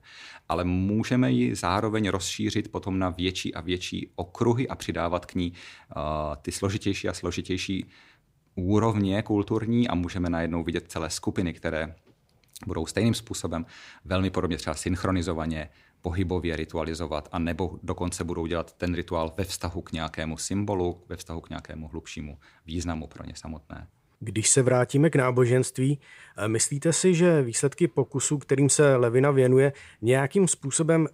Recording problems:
none

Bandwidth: 15.5 kHz